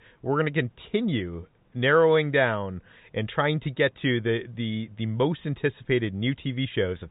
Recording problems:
high frequencies cut off; severe; nothing above 4 kHz

